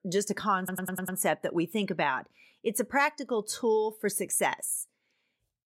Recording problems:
audio stuttering; at 0.5 s

